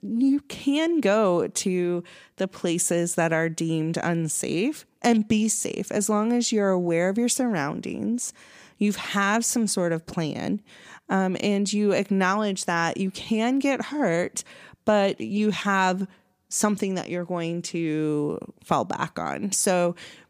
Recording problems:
none

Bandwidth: 15 kHz